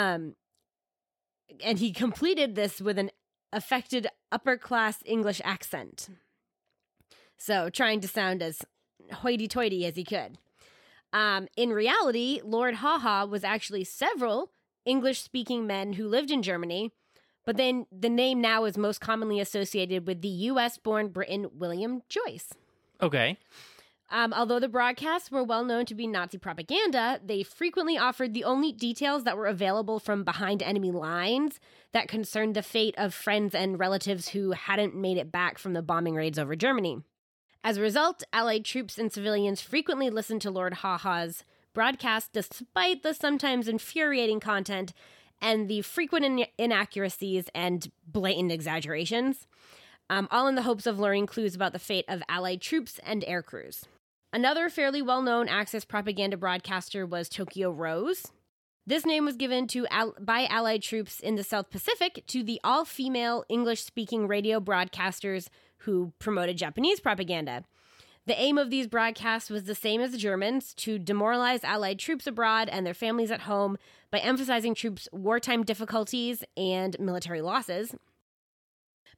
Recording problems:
abrupt cut into speech; at the start

